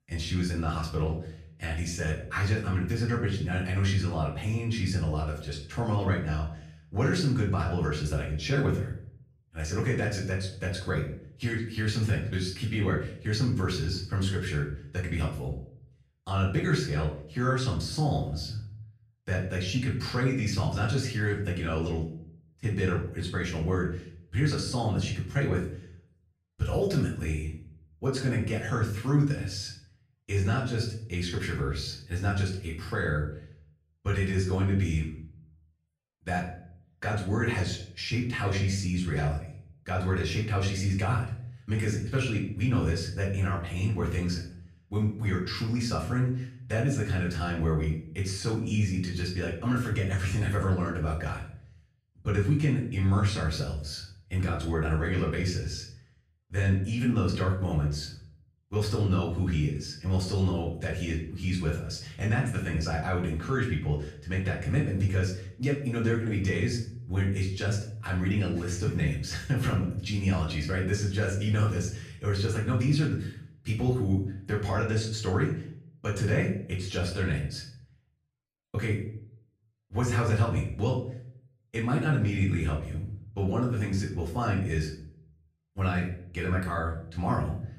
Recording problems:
off-mic speech; far
room echo; slight; dies away in 0.5 s

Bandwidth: 14.5 kHz